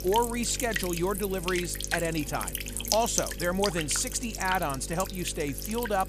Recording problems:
electrical hum; loud; throughout; 50 Hz, 5 dB below the speech

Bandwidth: 14.5 kHz